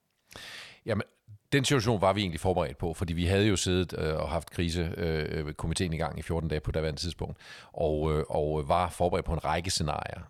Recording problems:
none

